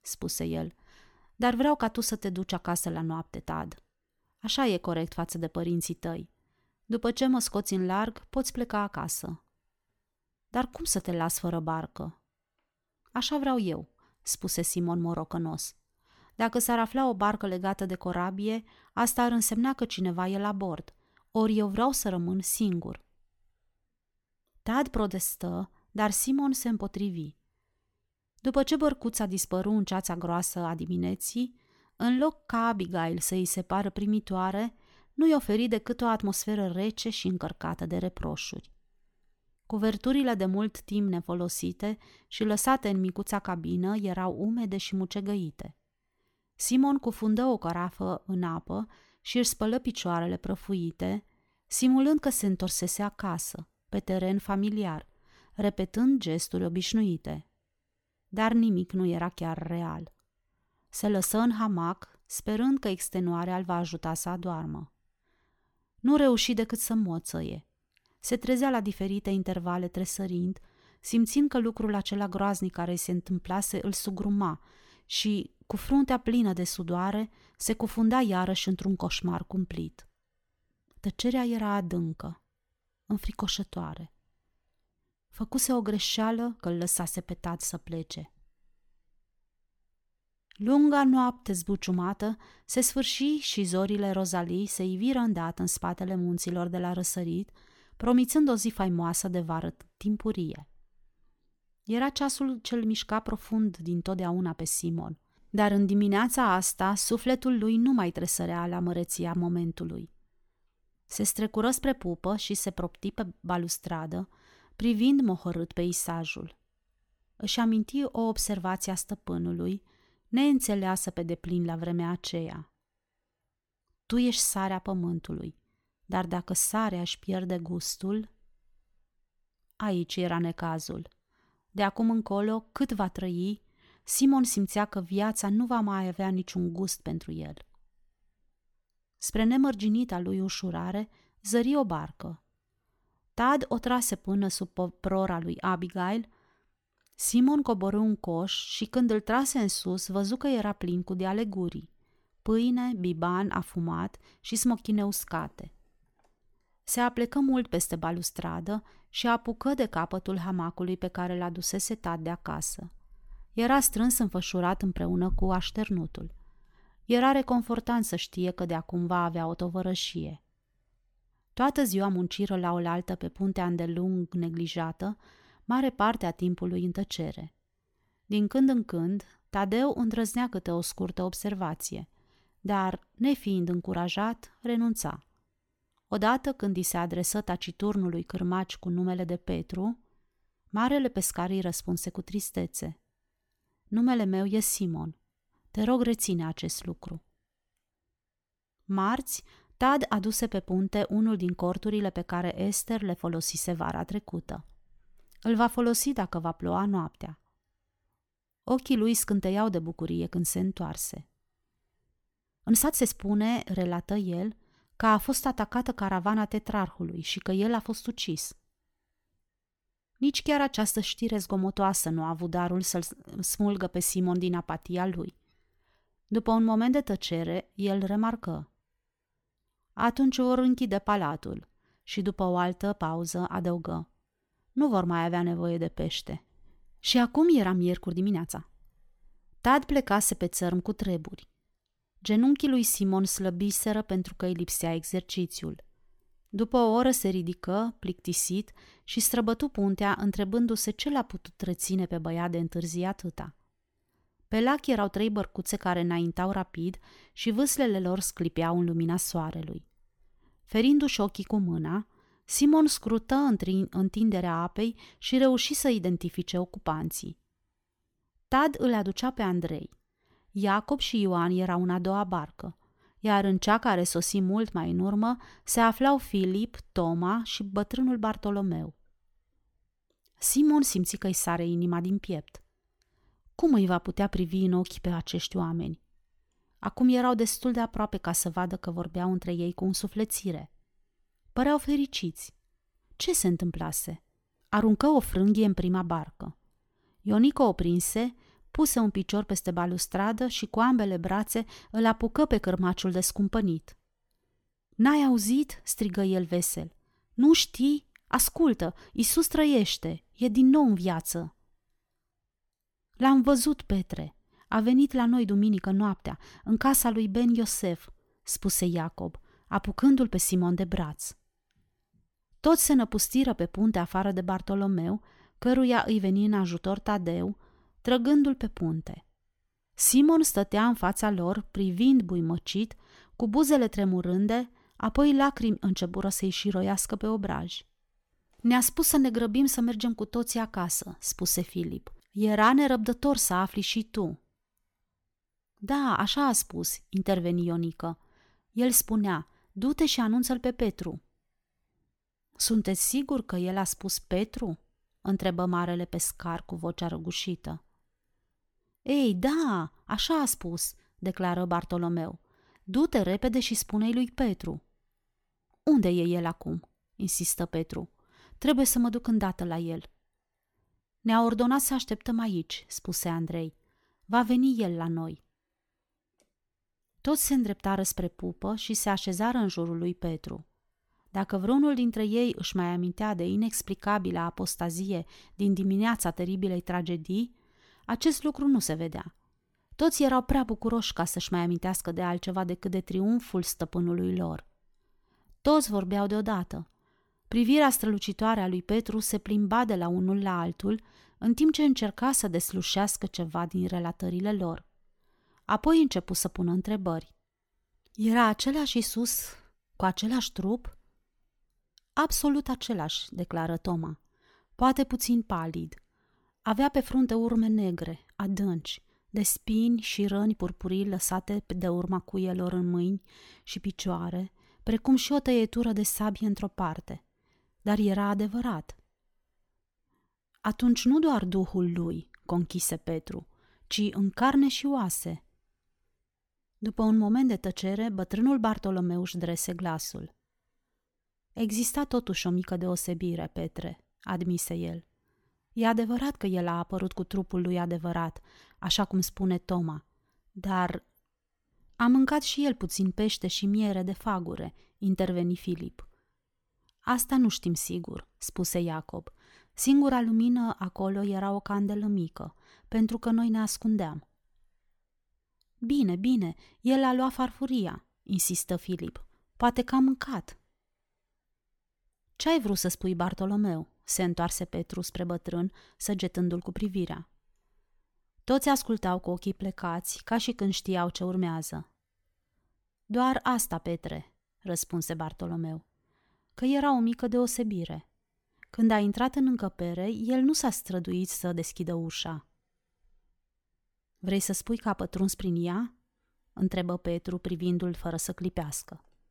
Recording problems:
uneven, jittery; strongly; from 32 s to 6:36

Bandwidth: 17.5 kHz